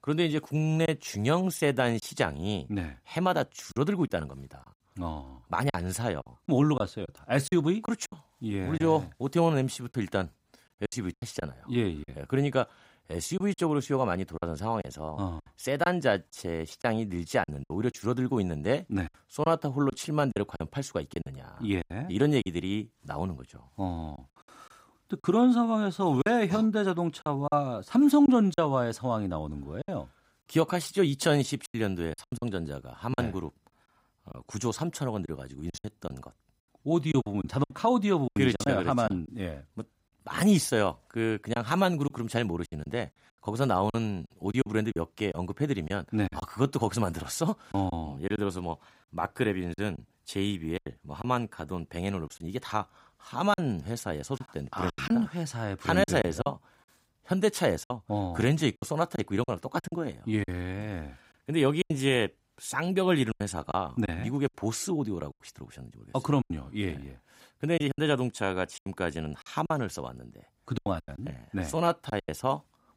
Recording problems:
choppy; very; 7% of the speech affected

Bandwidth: 15.5 kHz